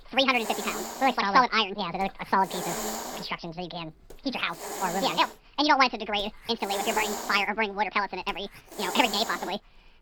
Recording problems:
wrong speed and pitch; too fast and too high; 1.7 times normal speed
high frequencies cut off; noticeable; nothing above 5.5 kHz
hiss; loud; throughout; 8 dB below the speech

